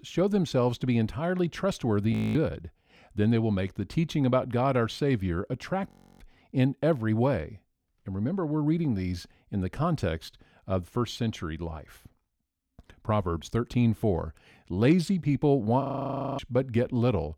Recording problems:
audio freezing; at 2 s, at 6 s and at 16 s for 0.5 s

